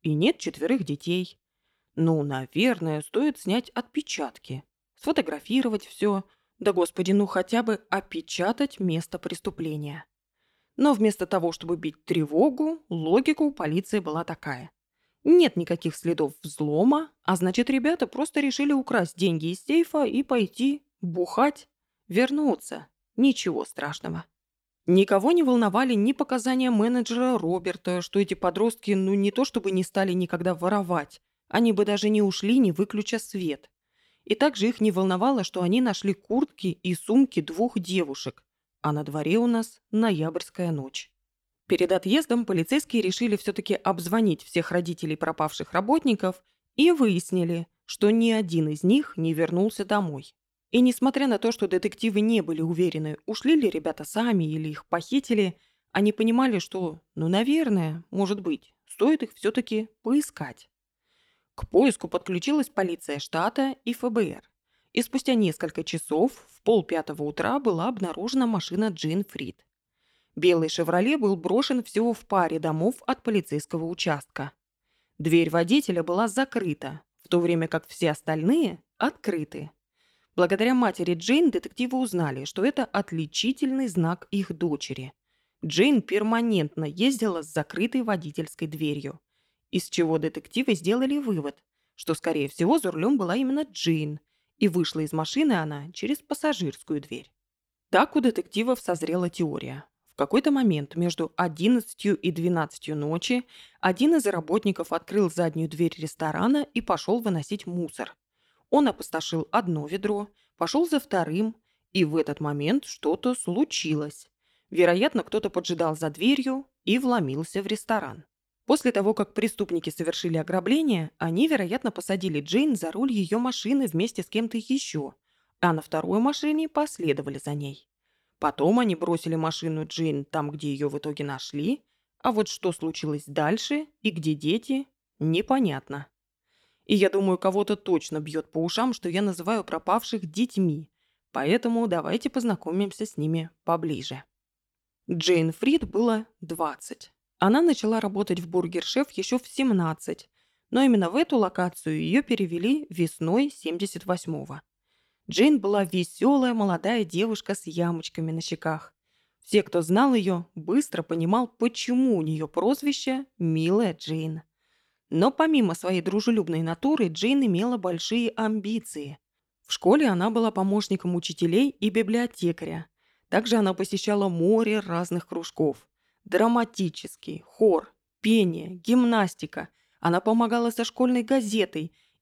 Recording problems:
none

